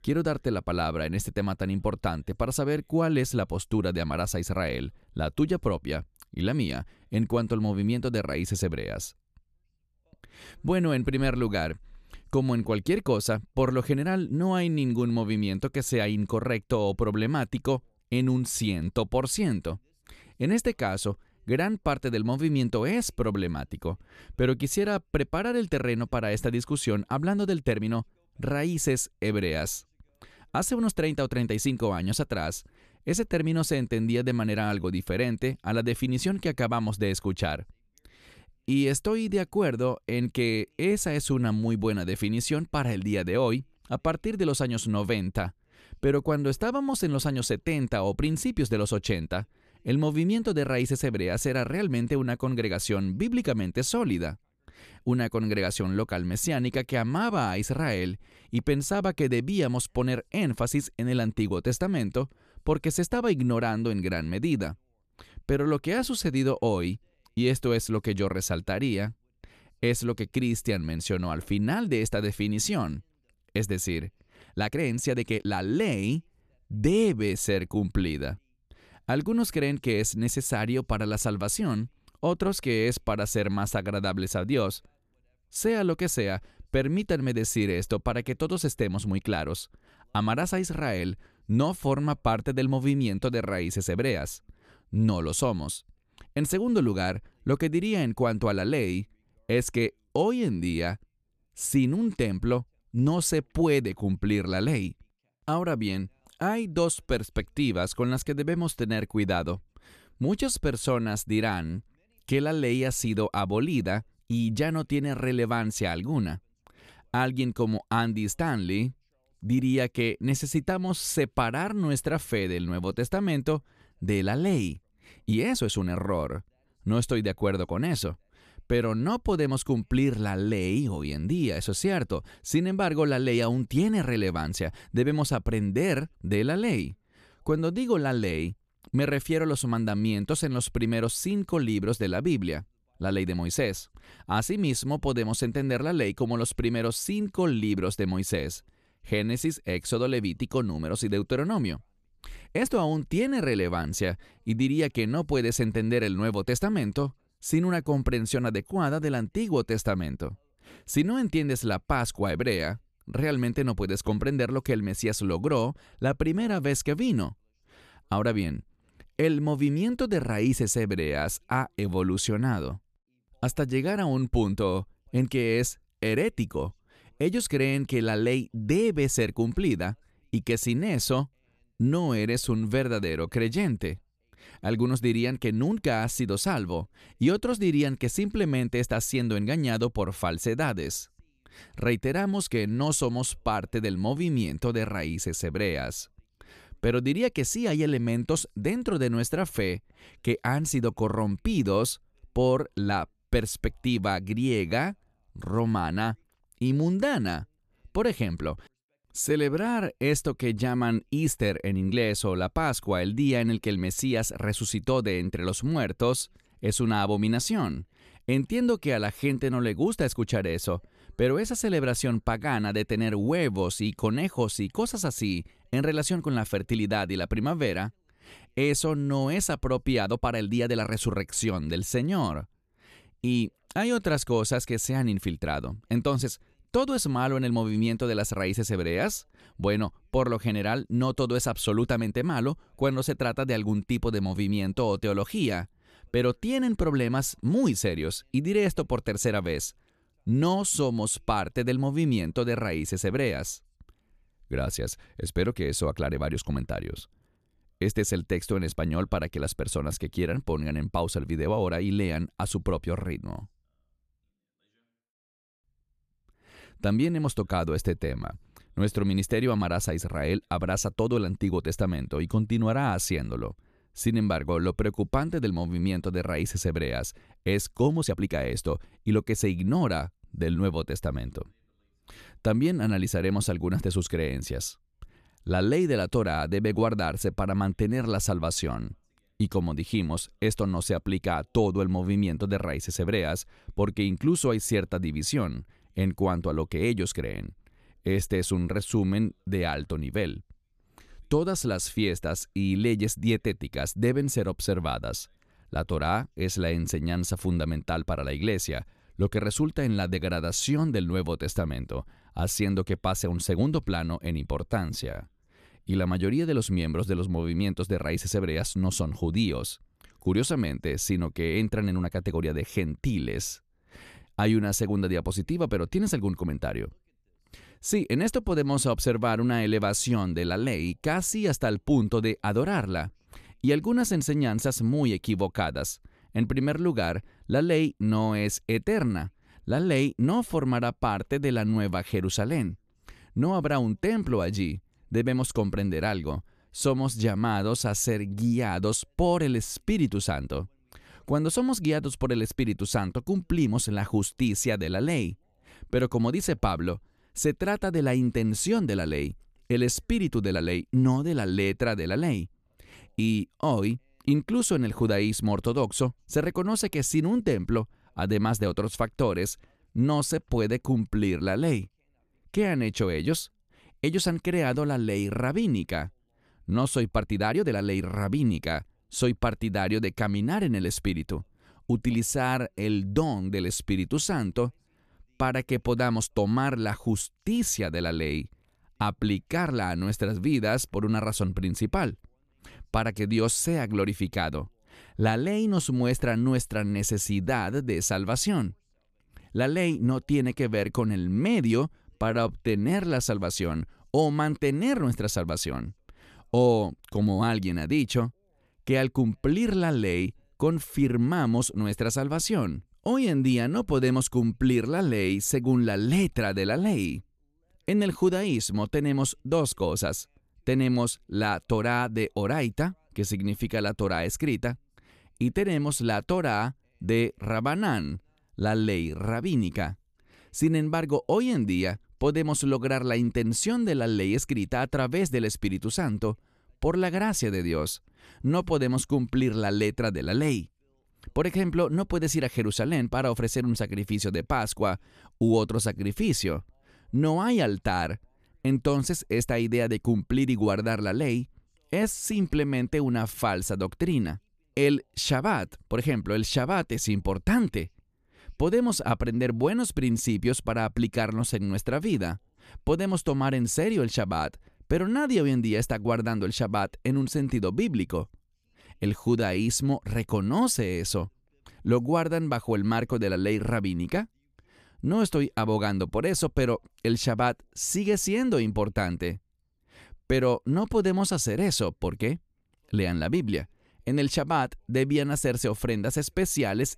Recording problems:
uneven, jittery; strongly; from 27 s to 7:50

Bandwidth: 14 kHz